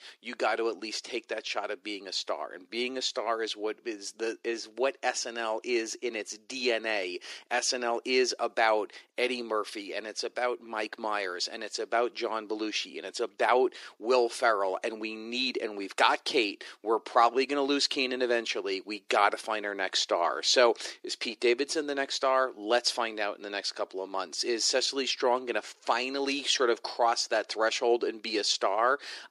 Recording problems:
thin; very; fading below 300 Hz

